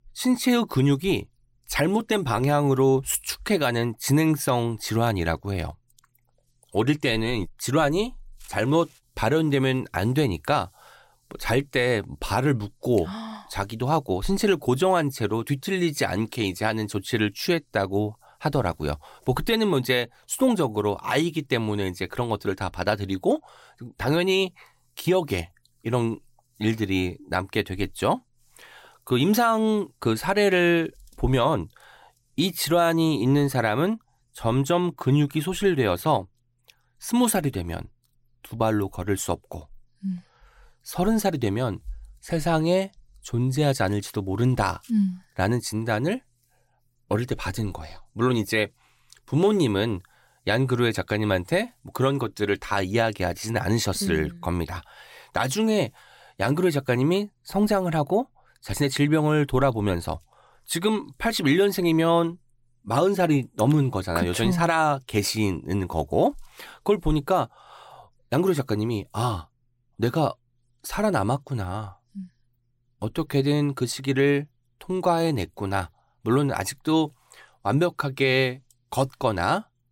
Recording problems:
none

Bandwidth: 16 kHz